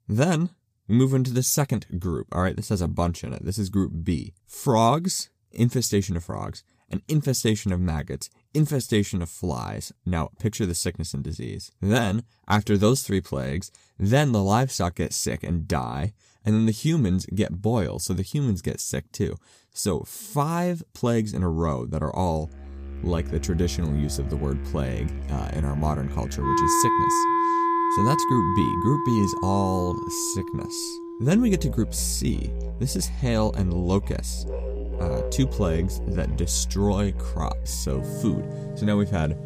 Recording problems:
background music; loud; from 23 s on; 3 dB below the speech

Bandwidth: 15 kHz